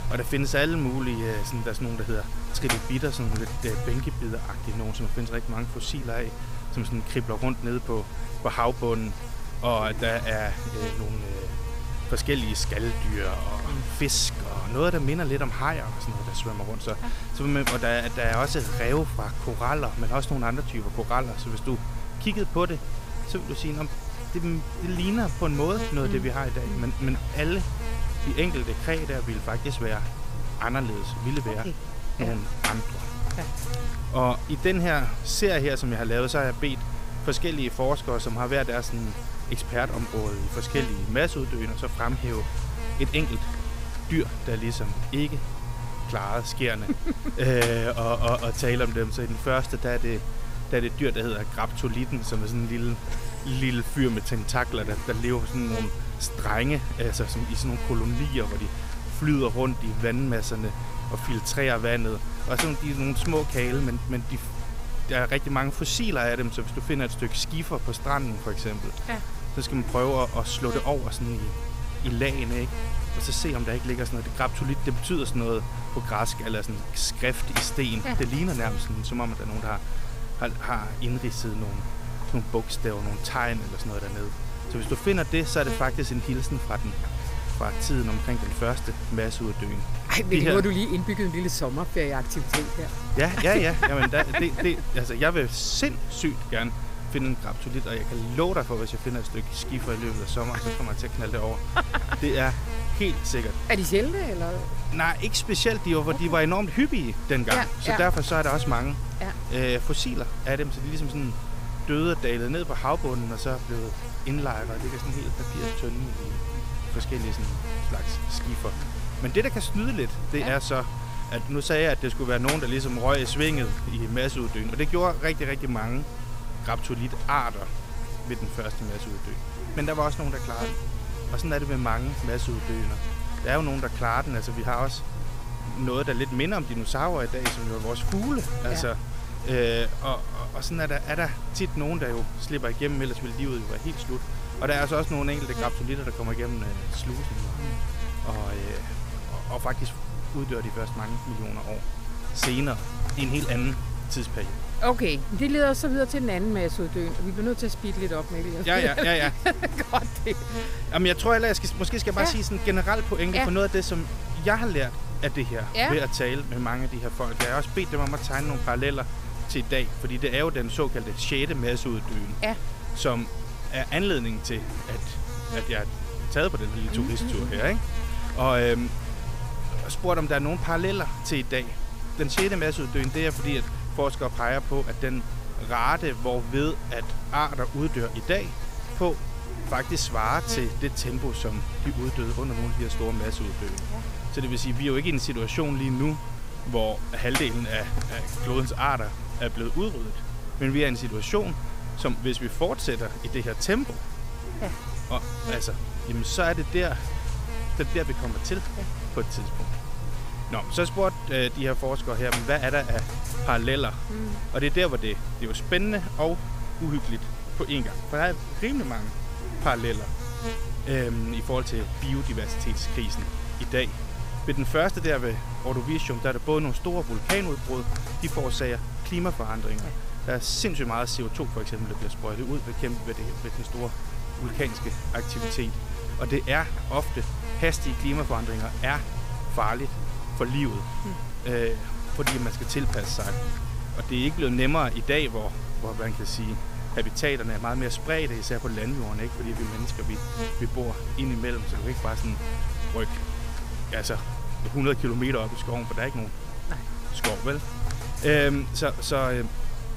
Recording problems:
electrical hum; loud; throughout; 50 Hz, 10 dB below the speech

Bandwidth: 15.5 kHz